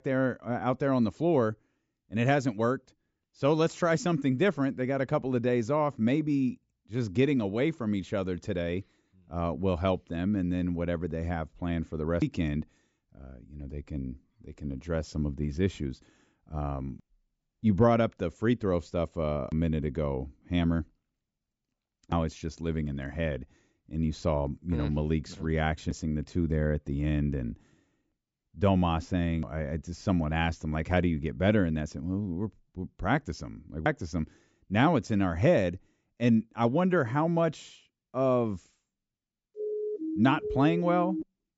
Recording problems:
high frequencies cut off; noticeable; nothing above 8 kHz
siren; noticeable; from 40 s on; peak 4 dB below the speech

